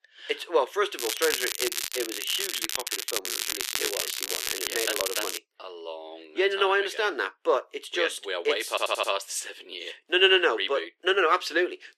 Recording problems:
thin; very; fading below 350 Hz
crackling; loud; from 1 to 5.5 s; 2 dB below the speech
audio stuttering; at 8.5 s

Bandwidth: 14.5 kHz